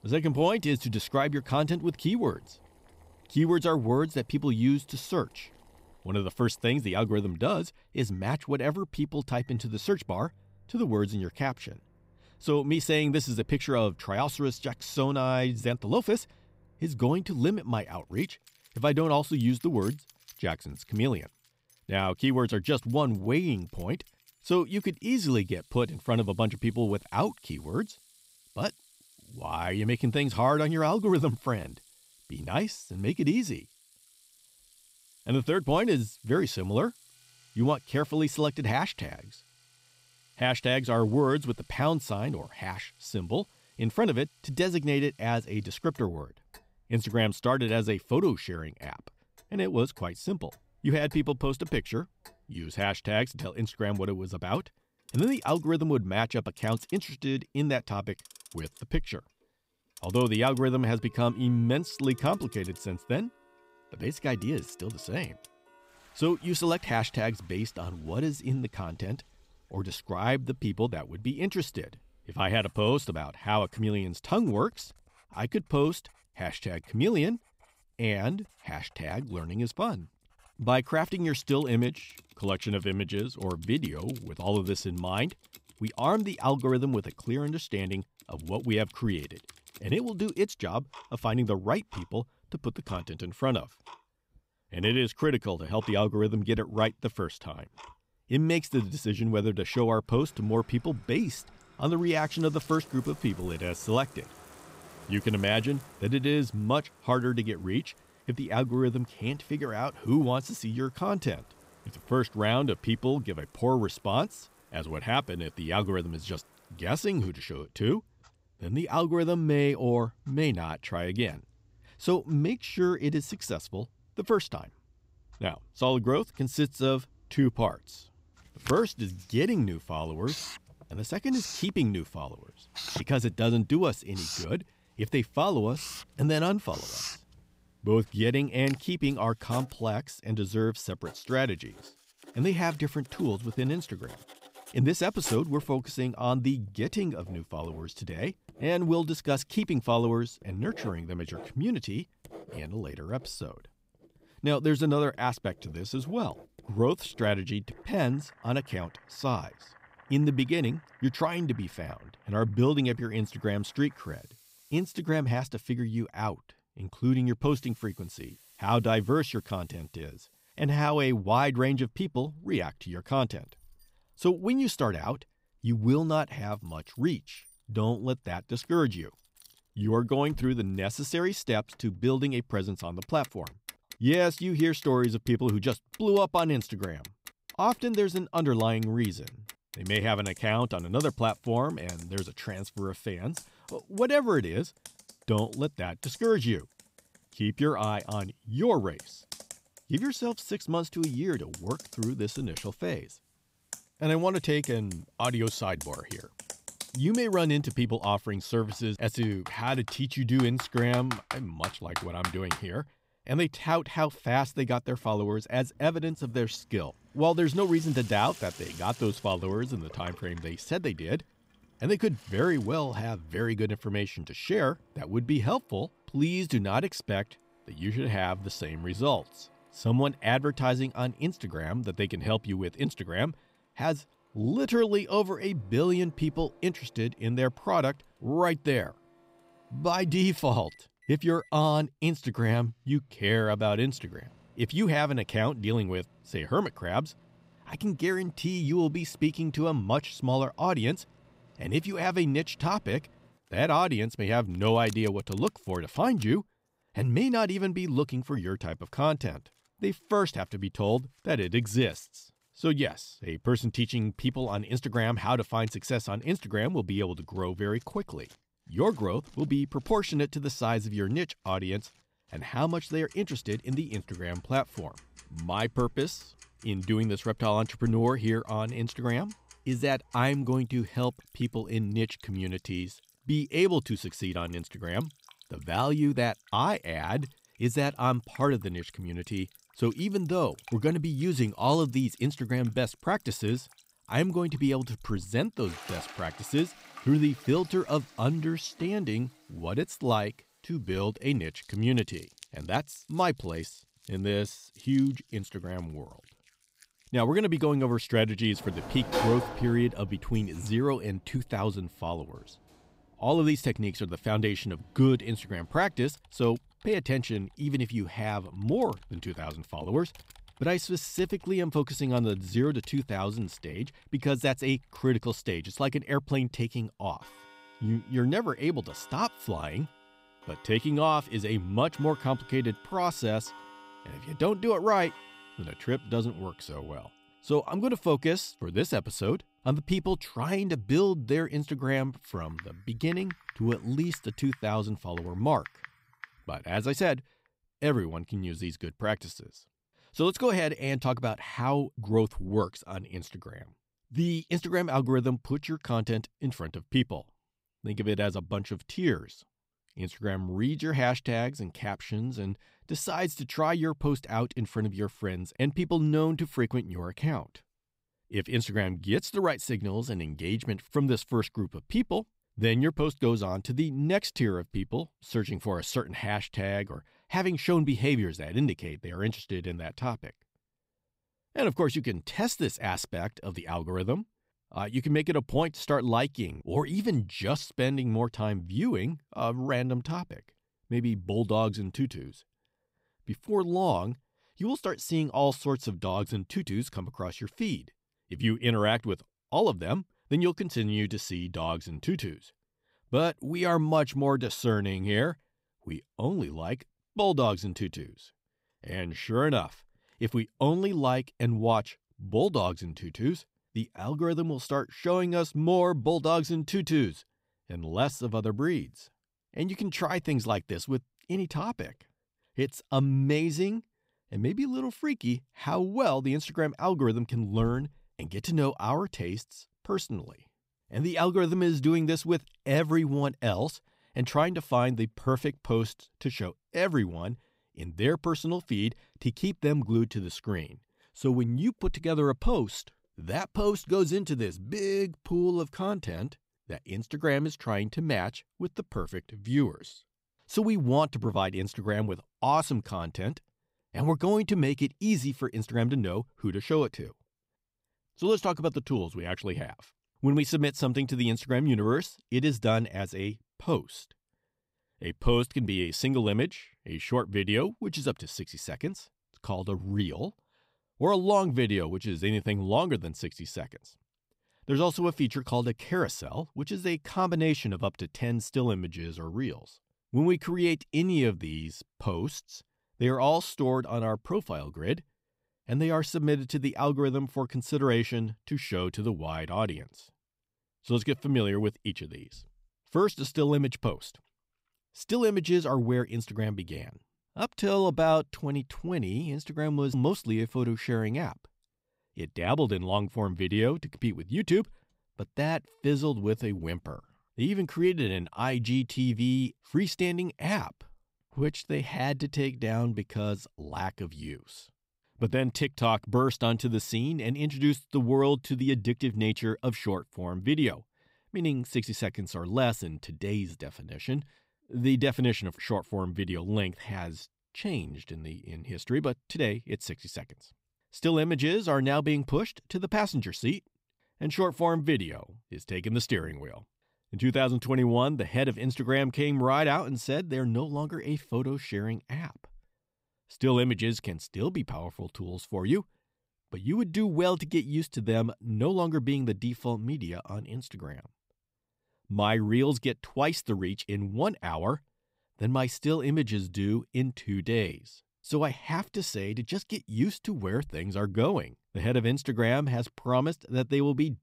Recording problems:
household noises; noticeable; until 5:47; 20 dB below the speech

